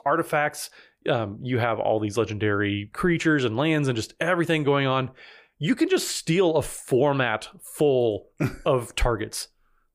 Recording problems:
none

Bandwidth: 15 kHz